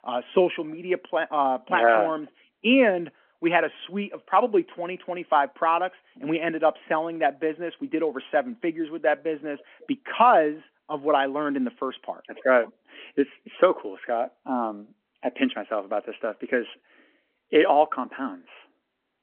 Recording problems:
phone-call audio

